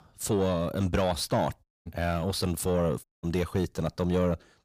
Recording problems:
distortion; slight; 10 dB below the speech
audio cutting out; at 1.5 s and at 3 s

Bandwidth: 15 kHz